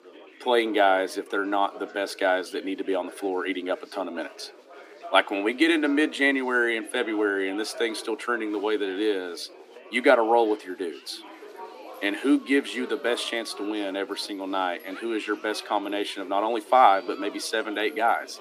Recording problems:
thin; somewhat; fading below 300 Hz
chatter from many people; noticeable; throughout; 20 dB below the speech

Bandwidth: 15 kHz